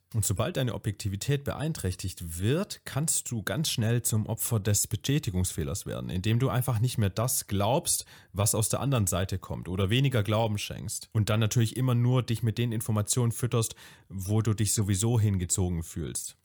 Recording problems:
none

